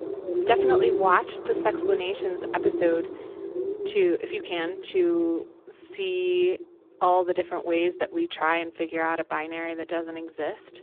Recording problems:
phone-call audio; poor line
animal sounds; loud; throughout; 3 dB below the speech

